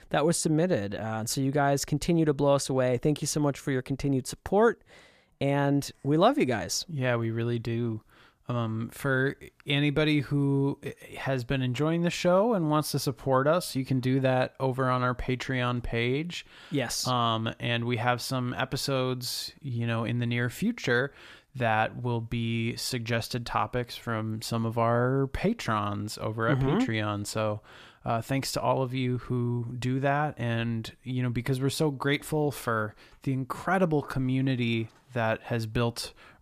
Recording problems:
none

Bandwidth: 14.5 kHz